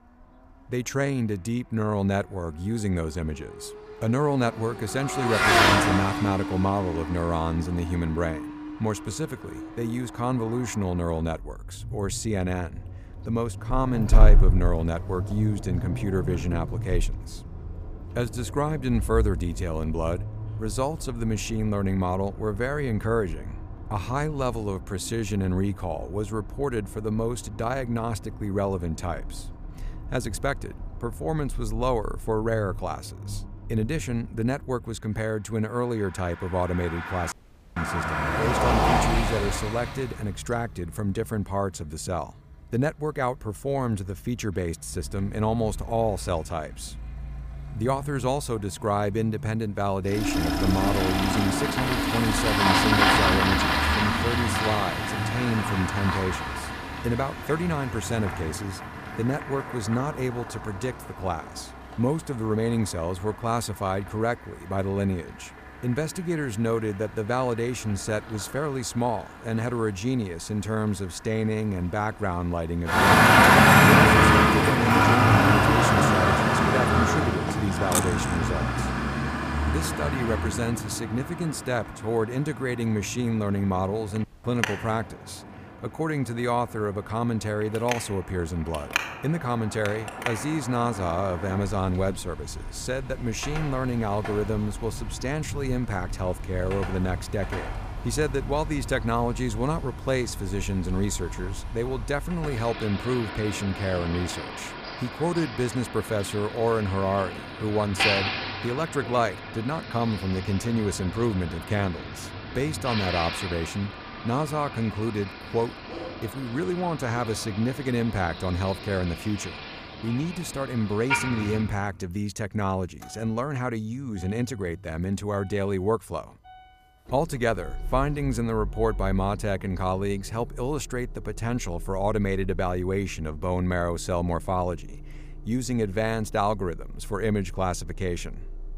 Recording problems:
traffic noise; very loud; throughout; 2 dB above the speech
audio cutting out; at 37 s and at 1:24
clattering dishes; loud; at 1:18; peak 1 dB above the speech

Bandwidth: 15 kHz